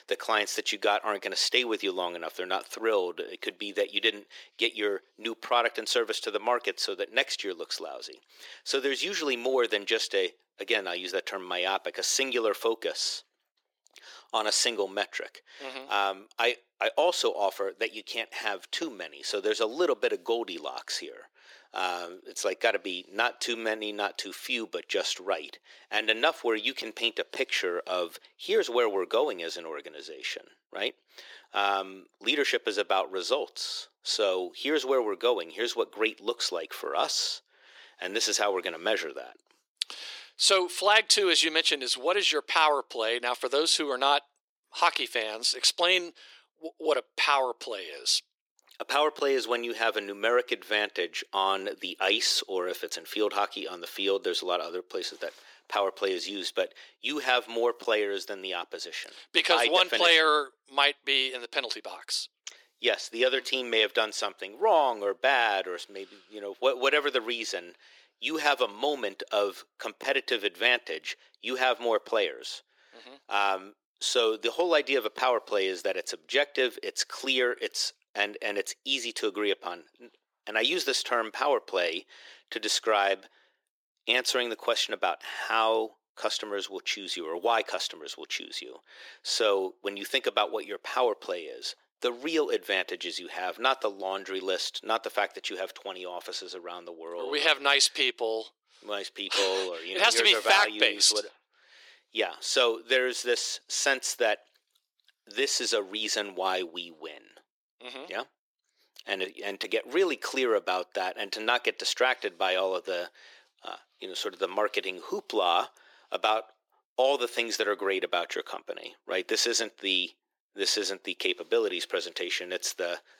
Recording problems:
thin; very; fading below 350 Hz

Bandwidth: 17 kHz